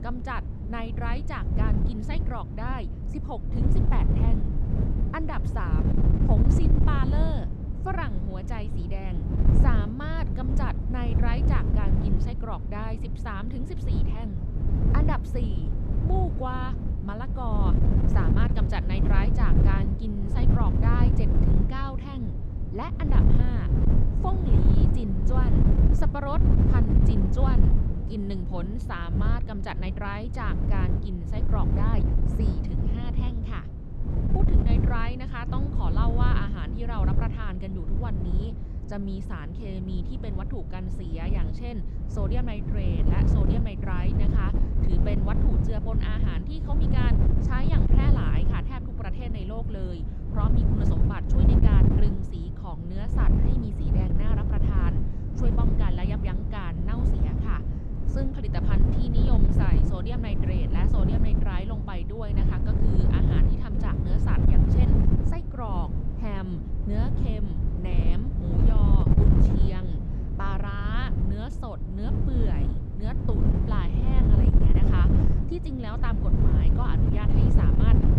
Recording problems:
wind noise on the microphone; heavy; as loud as the speech

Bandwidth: 14 kHz